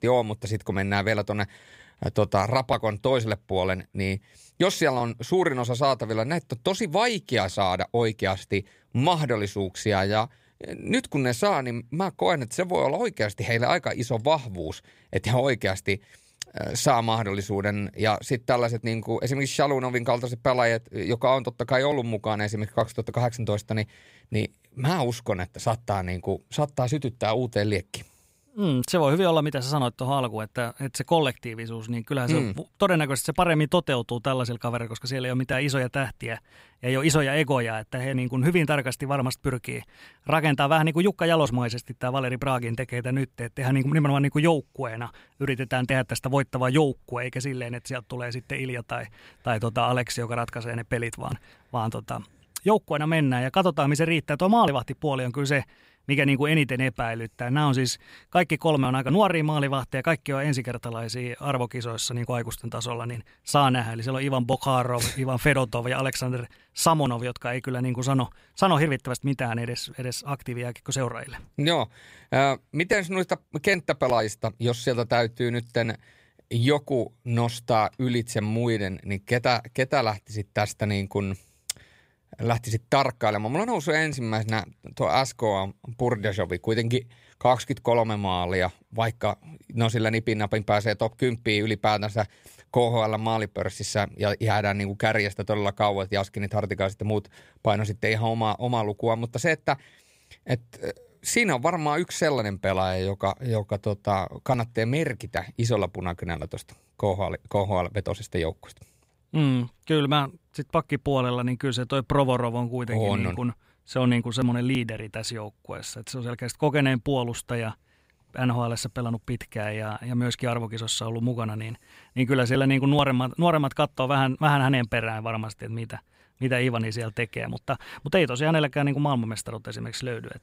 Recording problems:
none

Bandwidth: 15.5 kHz